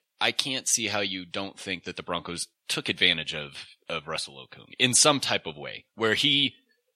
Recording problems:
thin; somewhat; fading below 700 Hz

